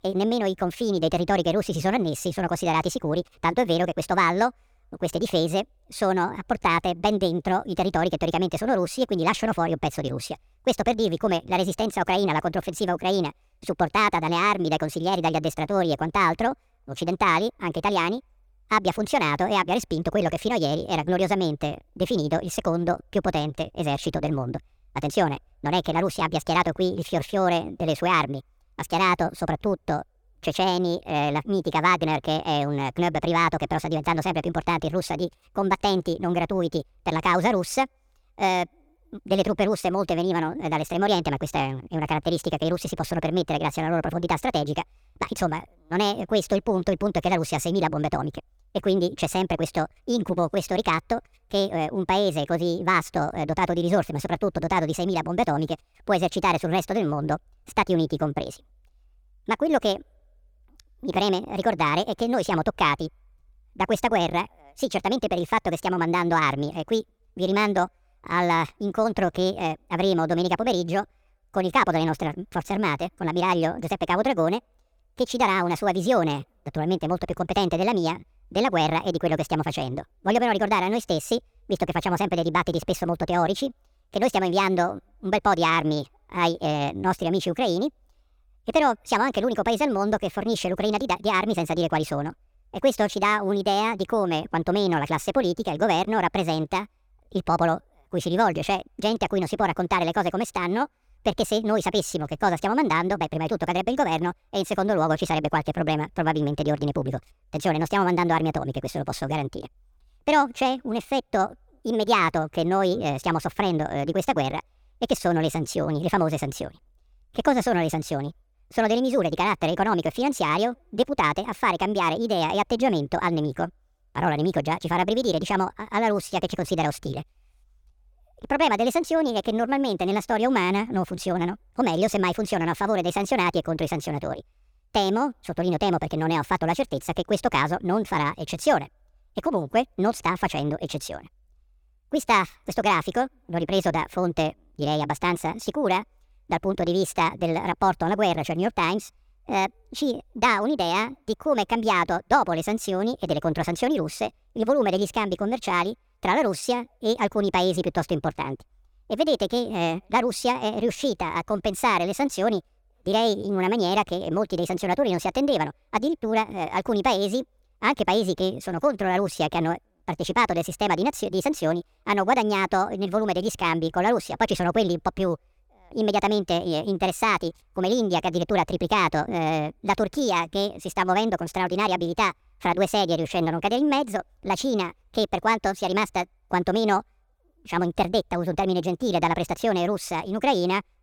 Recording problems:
wrong speed and pitch; too fast and too high; 1.5 times normal speed

